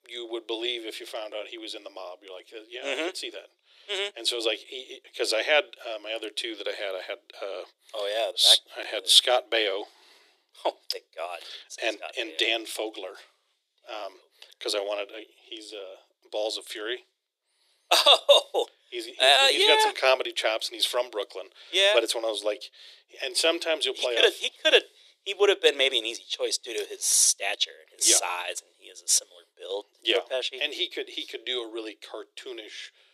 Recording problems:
thin; very; fading below 350 Hz

